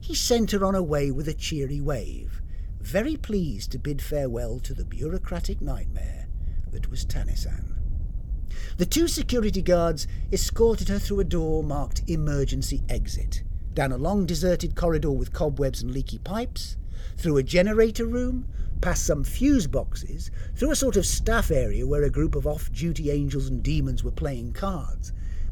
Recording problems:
wind noise on the microphone; occasional gusts; 25 dB below the speech

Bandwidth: 18 kHz